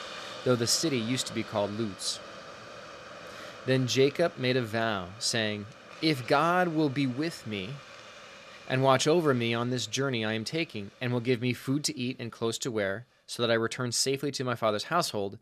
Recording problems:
hiss; noticeable; throughout; 15 dB below the speech

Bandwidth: 14 kHz